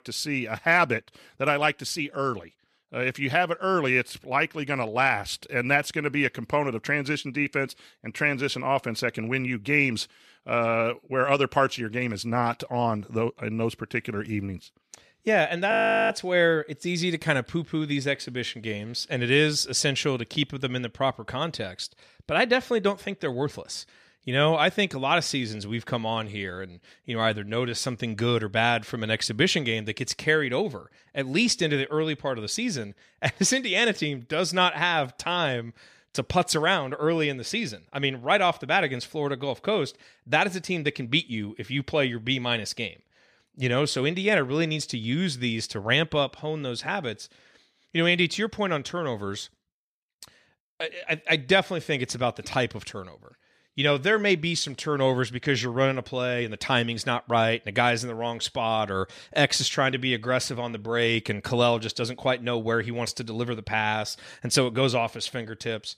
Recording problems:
audio freezing; at 16 s

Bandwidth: 14 kHz